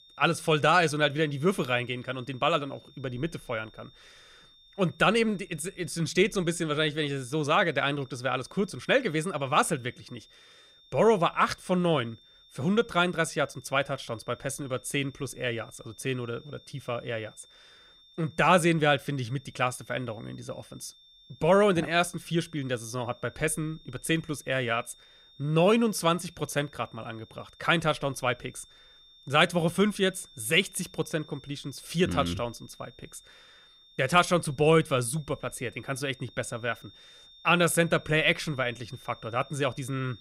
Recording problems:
high-pitched whine; faint; throughout; 3.5 kHz, 25 dB below the speech

